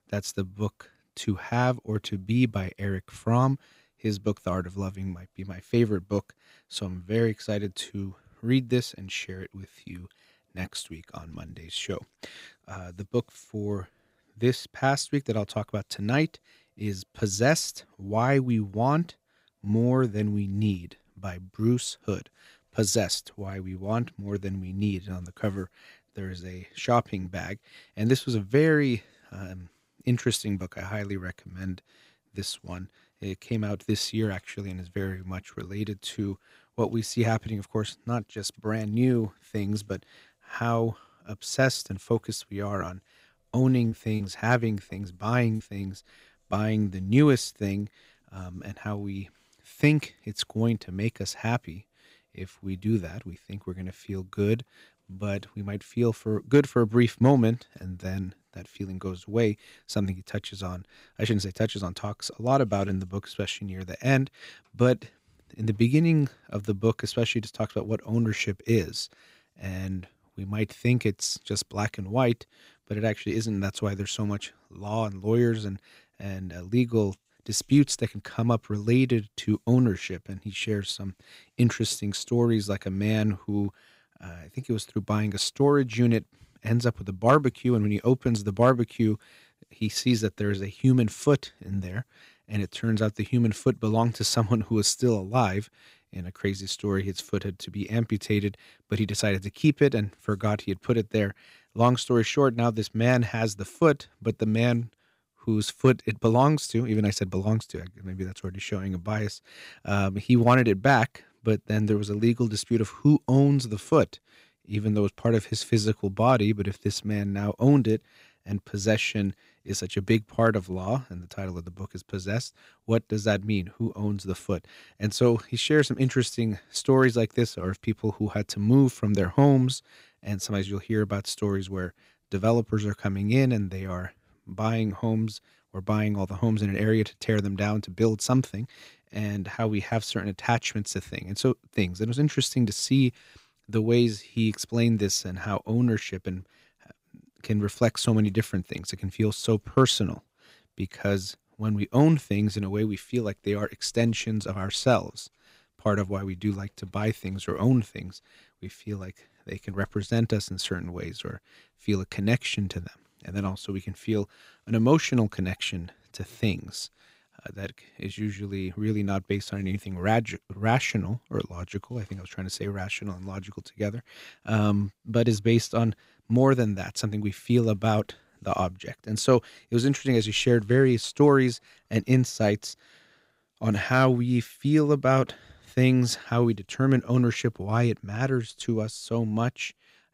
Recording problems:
choppy; very; from 44 to 46 s; 6% of the speech affected

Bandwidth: 15.5 kHz